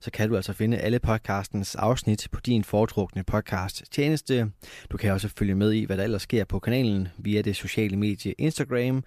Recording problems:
none

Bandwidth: 14.5 kHz